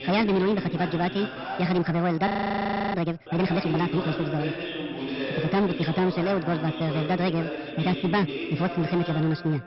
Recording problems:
wrong speed and pitch; too fast and too high; 1.5 times normal speed
high frequencies cut off; noticeable; nothing above 5.5 kHz
distortion; slight; 11% of the sound clipped
voice in the background; loud; throughout; 7 dB below the speech
audio freezing; at 2.5 s for 0.5 s

